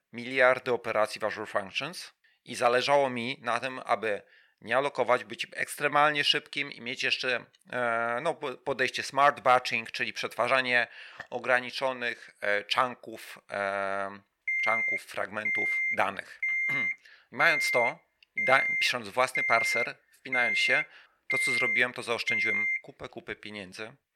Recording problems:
thin; somewhat; fading below 450 Hz
alarm; loud; from 14 to 23 s; peak 3 dB above the speech

